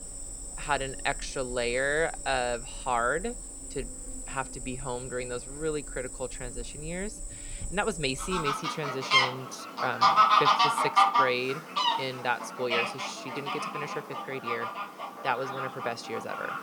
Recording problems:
animal sounds; very loud; throughout; 3 dB above the speech

